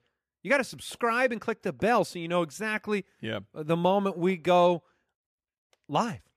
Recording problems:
none

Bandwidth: 14.5 kHz